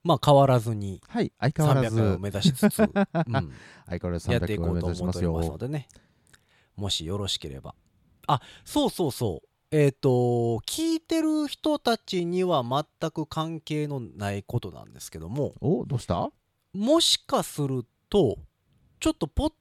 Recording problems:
none

